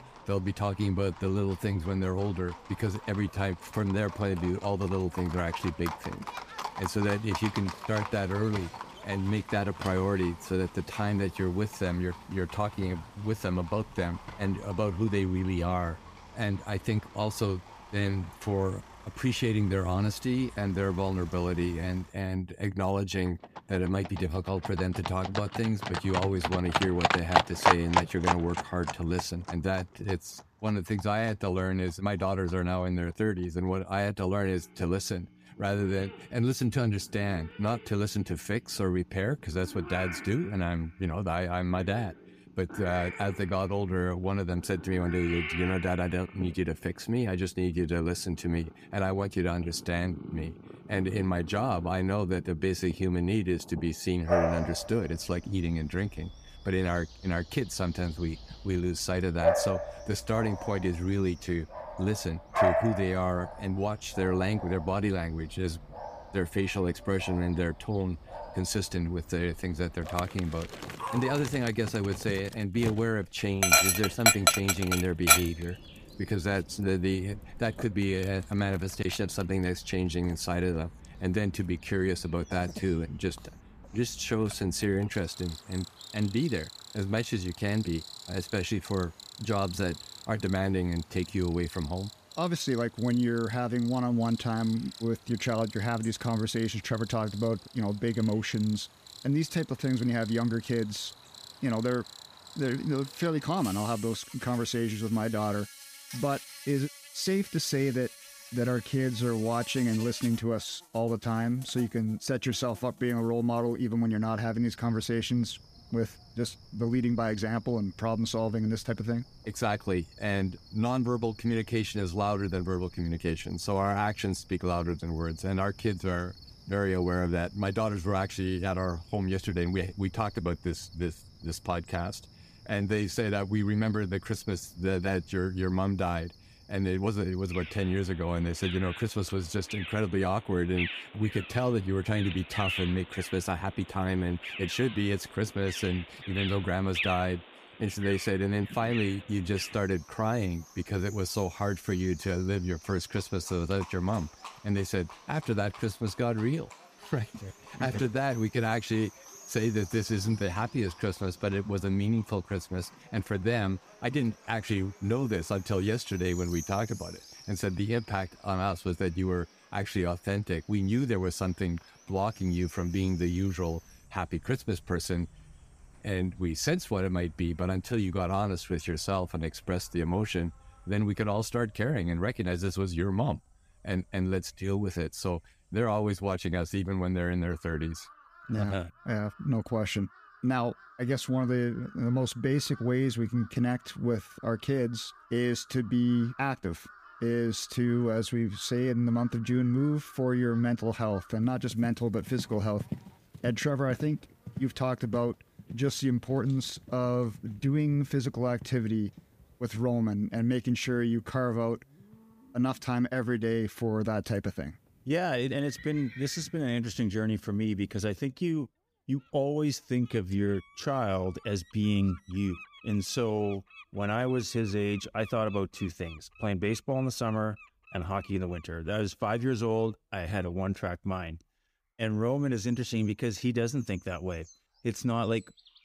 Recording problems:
animal sounds; loud; throughout; 5 dB below the speech

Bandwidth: 15 kHz